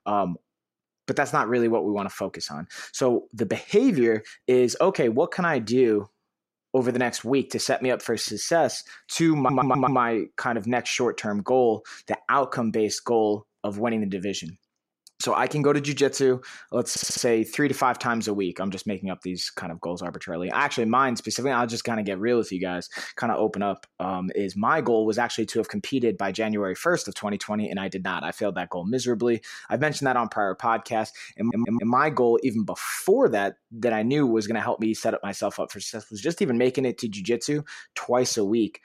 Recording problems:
audio stuttering; at 9.5 s, at 17 s and at 31 s

